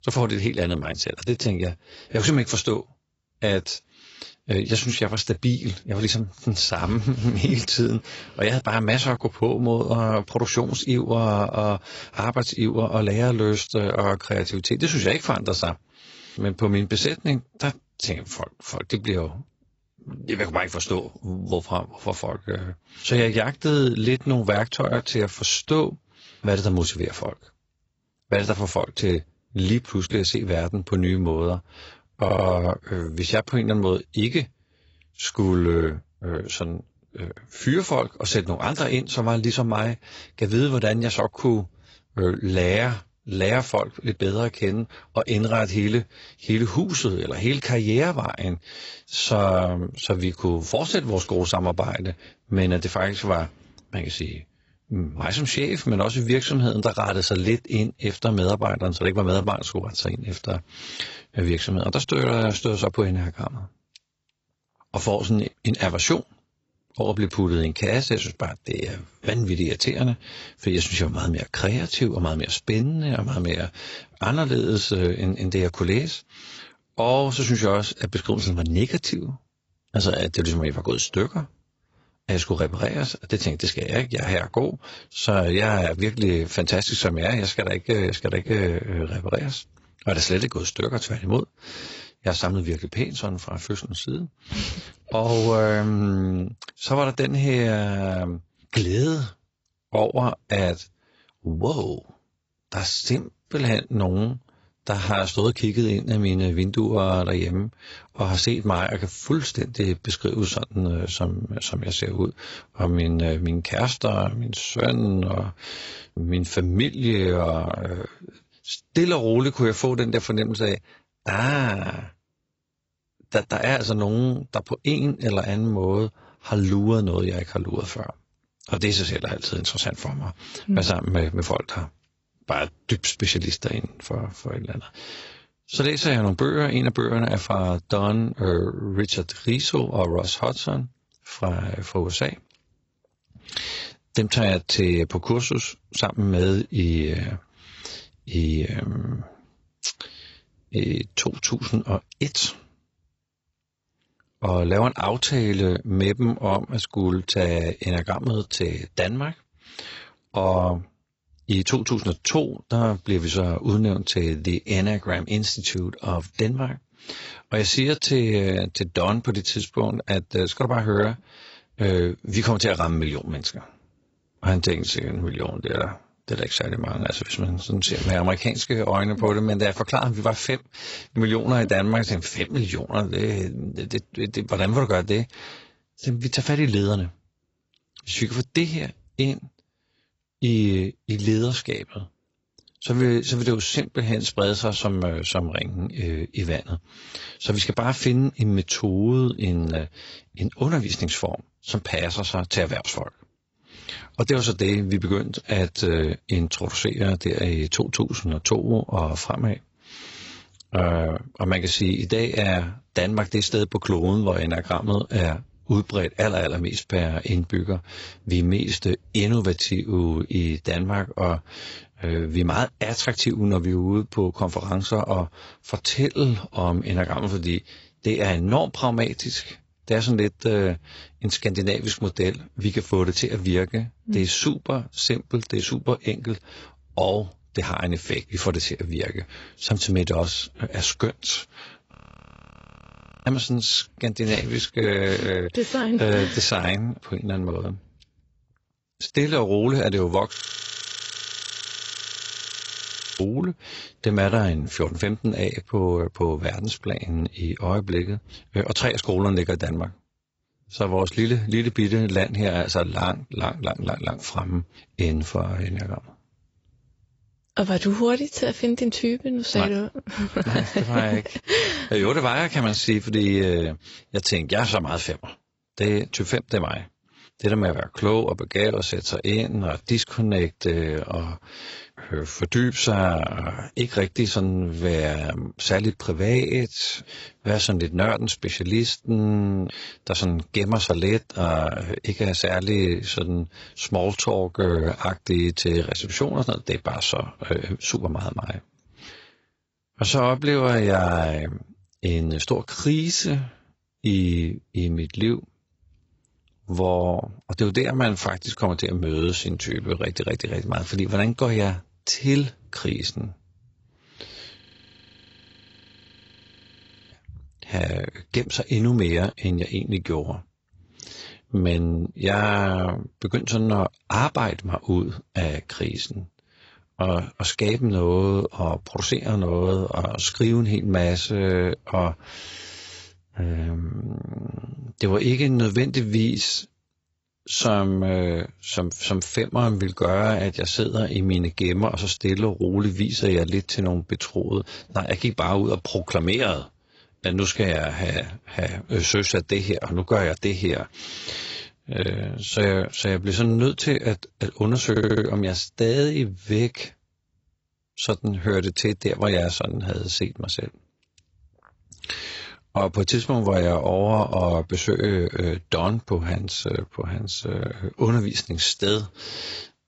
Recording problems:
garbled, watery; badly; nothing above 7.5 kHz
audio stuttering; at 32 s and at 5:55
audio freezing; at 4:02 for 1.5 s, at 4:10 for 3 s and at 5:15 for 2.5 s

